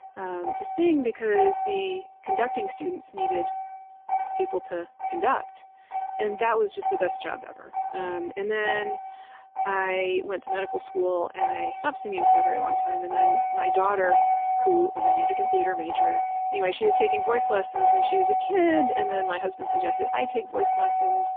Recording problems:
phone-call audio; poor line; nothing above 3 kHz
traffic noise; very loud; throughout; 1 dB above the speech

